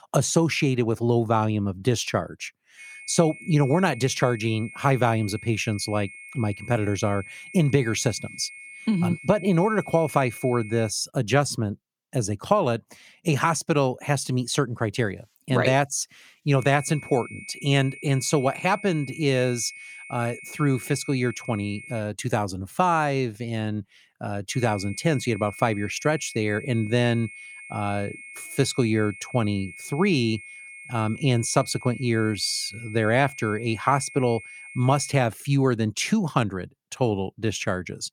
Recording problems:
high-pitched whine; noticeable; from 3 to 11 s, from 17 to 22 s and from 25 to 35 s; 2 kHz, 15 dB below the speech

